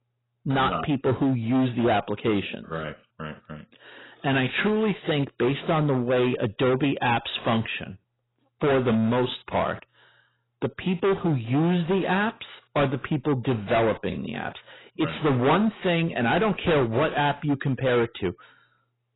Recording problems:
distortion; heavy; 14% of the sound clipped
garbled, watery; badly; nothing above 4 kHz

